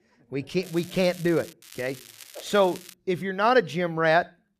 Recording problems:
crackling; noticeable; at 0.5 s and from 1.5 to 3 s; 20 dB below the speech

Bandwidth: 14.5 kHz